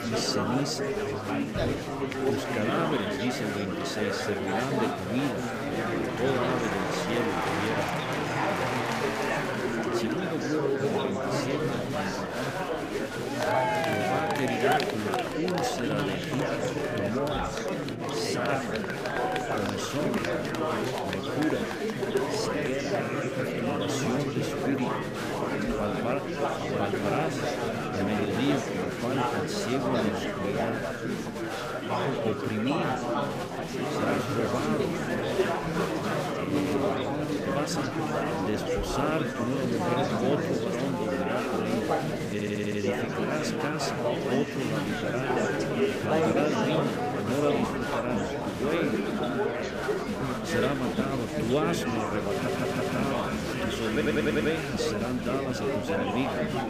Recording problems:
murmuring crowd; very loud; throughout; 4 dB above the speech
electrical hum; noticeable; until 14 s, from 19 to 28 s and from 35 to 48 s; 60 Hz, 20 dB below the speech
audio stuttering; at 42 s, at 52 s and at 54 s

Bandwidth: 15 kHz